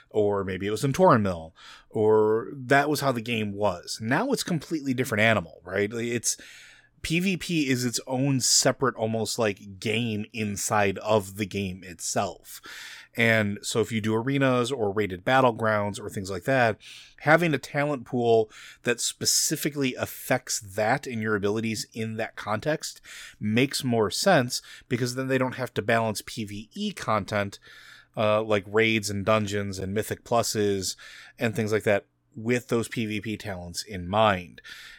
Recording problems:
none

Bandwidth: 17.5 kHz